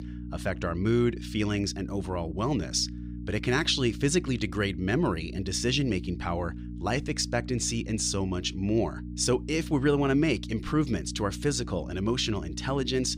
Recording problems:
electrical hum; noticeable; throughout; 60 Hz, 15 dB below the speech

